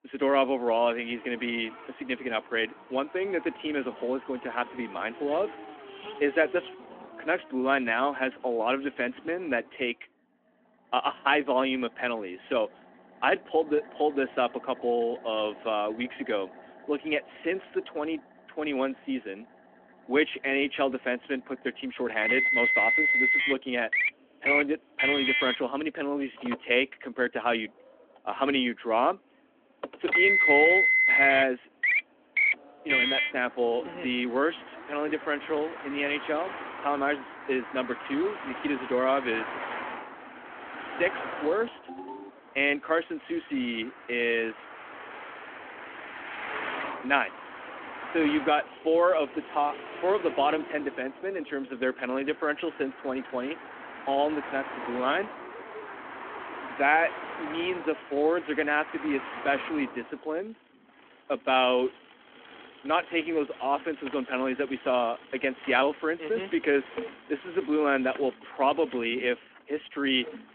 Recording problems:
phone-call audio; nothing above 3.5 kHz
traffic noise; very loud; throughout; as loud as the speech
phone ringing; faint; at 42 s; peak 15 dB below the speech

